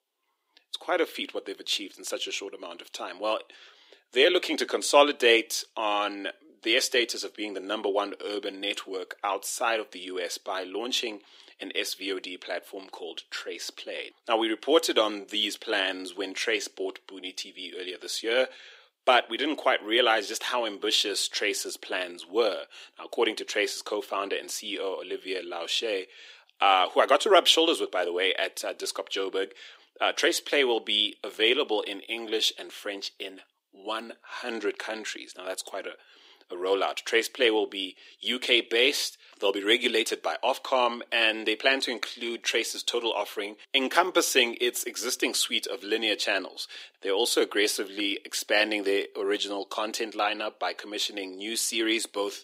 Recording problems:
thin; very; fading below 300 Hz

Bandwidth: 15.5 kHz